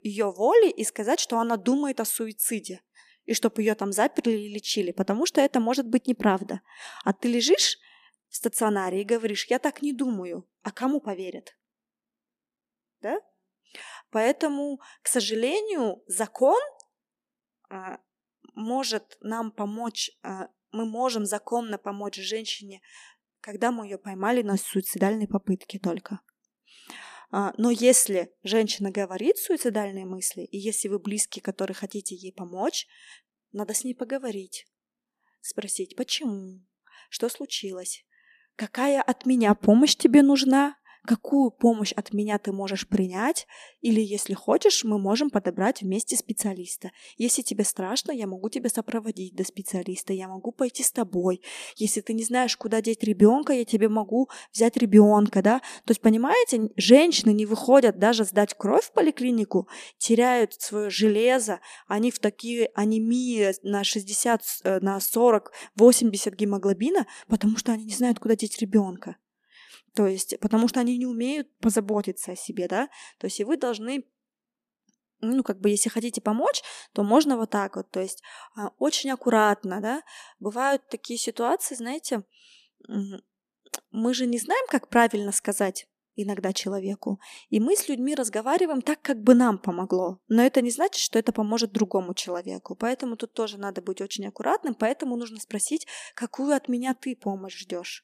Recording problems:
none

